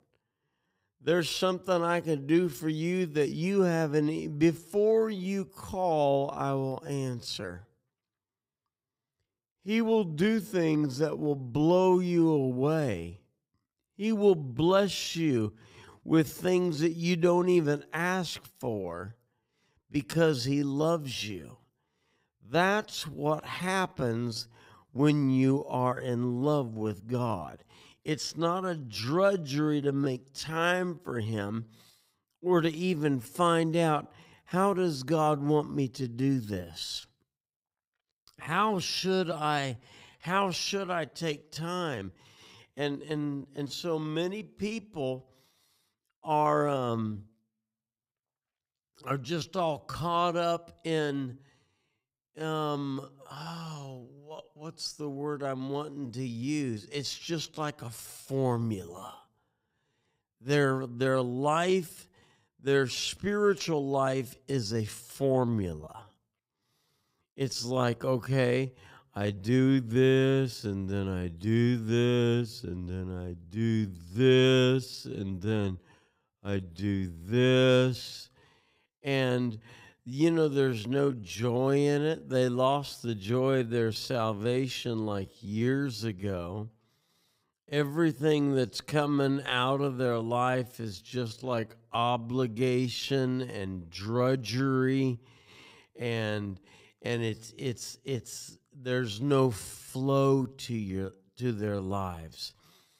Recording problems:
wrong speed, natural pitch; too slow; 0.6 times normal speed

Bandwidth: 15.5 kHz